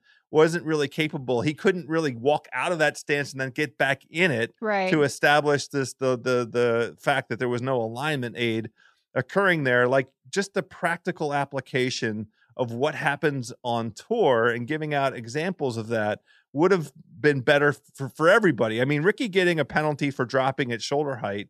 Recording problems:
none

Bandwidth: 14 kHz